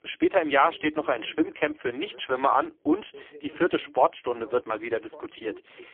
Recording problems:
phone-call audio; poor line; nothing above 3.5 kHz
voice in the background; faint; throughout; 25 dB below the speech

